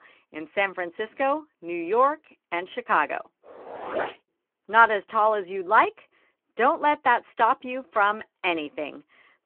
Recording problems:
phone-call audio

